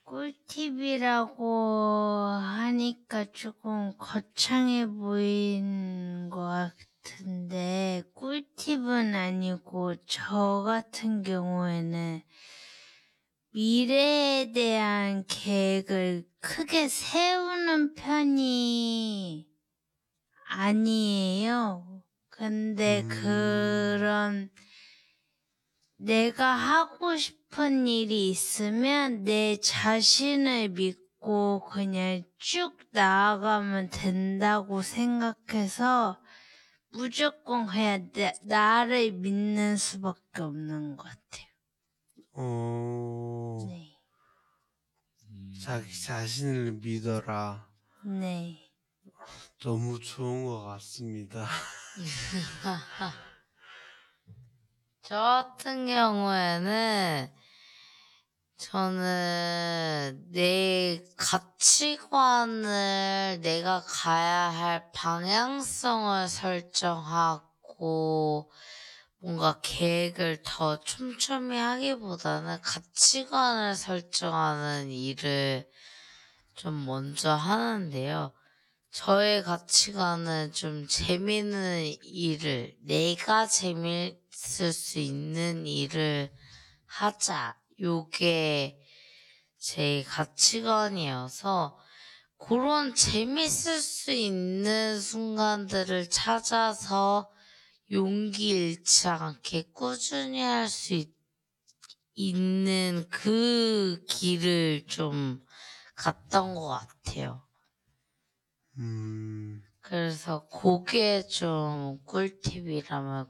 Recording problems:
wrong speed, natural pitch; too slow; 0.5 times normal speed

